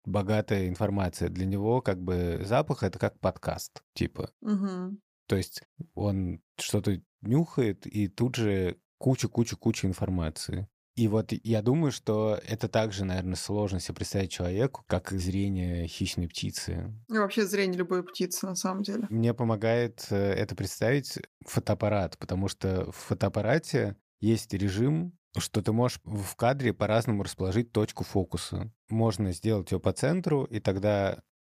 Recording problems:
none

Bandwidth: 15 kHz